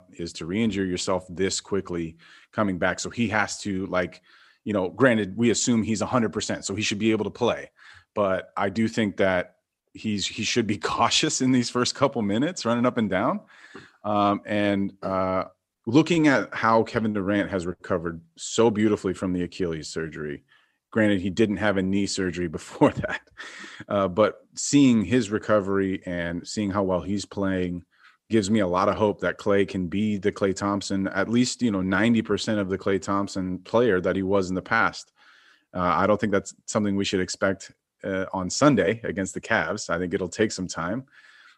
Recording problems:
none

